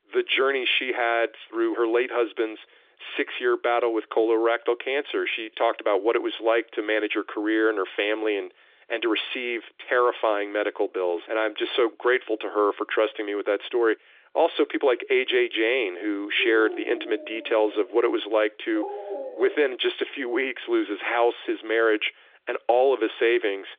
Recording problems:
phone-call audio; nothing above 3.5 kHz
dog barking; noticeable; from 16 to 20 s; peak 9 dB below the speech

